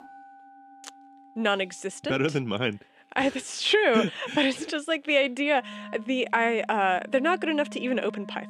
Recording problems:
background music; noticeable; throughout; 20 dB below the speech

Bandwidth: 15 kHz